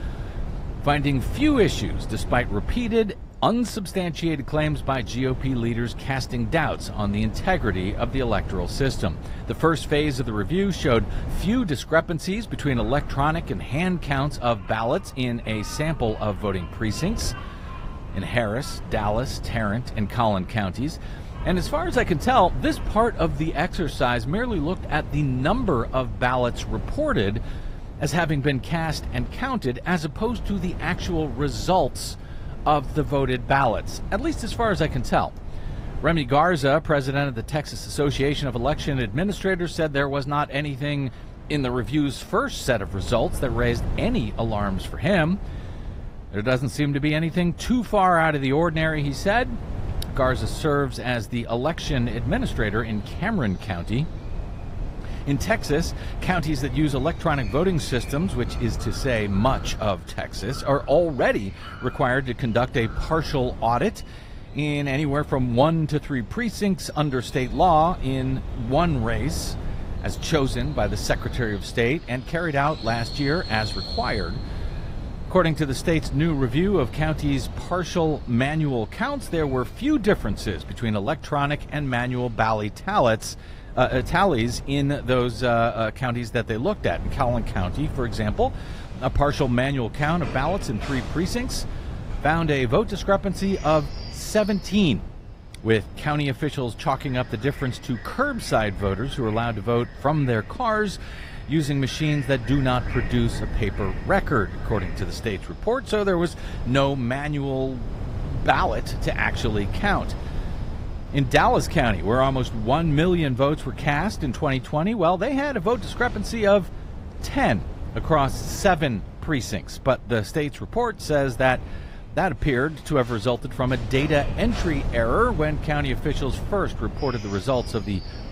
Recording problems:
garbled, watery; slightly; nothing above 15.5 kHz
wind noise on the microphone; occasional gusts; 20 dB below the speech
animal sounds; faint; throughout; 20 dB below the speech

